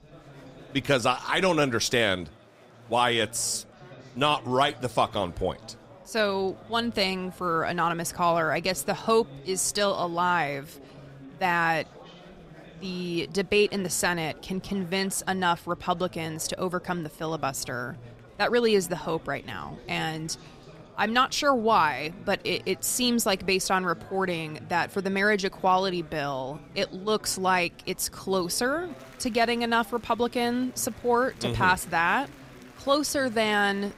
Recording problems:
chatter from many people; faint; throughout; 20 dB below the speech

